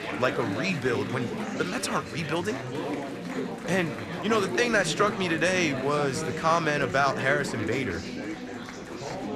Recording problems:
chatter from many people; loud; throughout; 6 dB below the speech

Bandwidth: 13.5 kHz